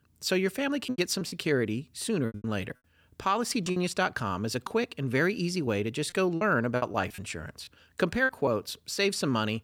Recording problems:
choppy; very; from 1 to 2.5 s, from 3.5 to 5 s and from 5.5 to 8.5 s; 12% of the speech affected

